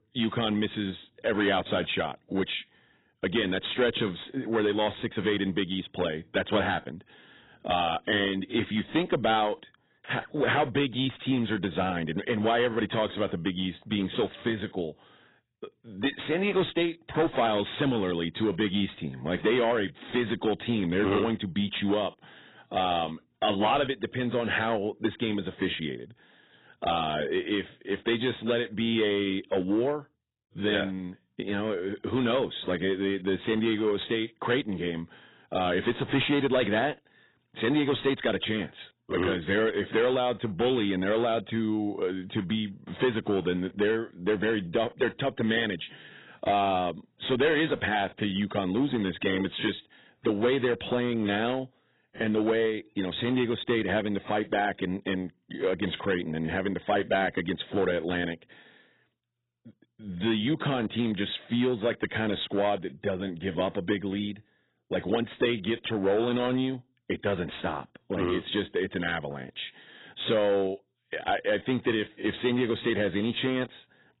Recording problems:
garbled, watery; badly; nothing above 4 kHz
distortion; slight; 4% of the sound clipped

